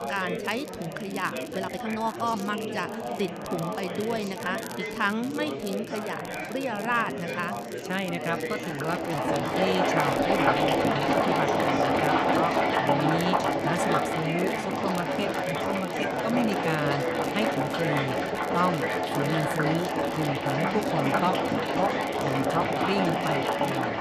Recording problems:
household noises; very loud; from 9 s on; 5 dB above the speech
chatter from many people; loud; throughout; 2 dB below the speech
crackle, like an old record; noticeable; 15 dB below the speech
uneven, jittery; strongly; from 1.5 to 23 s

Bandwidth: 14 kHz